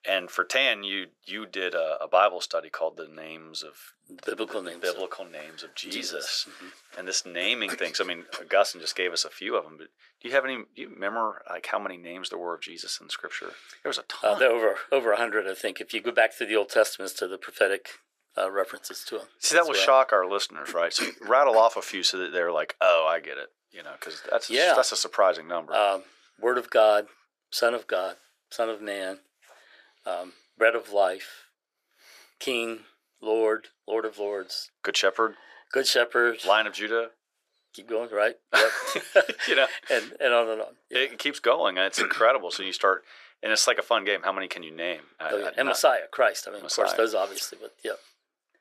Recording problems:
thin; very; fading below 450 Hz

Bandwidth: 14.5 kHz